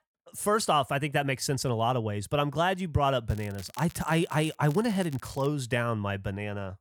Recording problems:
crackling; faint; from 3 to 5.5 s; 20 dB below the speech

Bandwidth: 17.5 kHz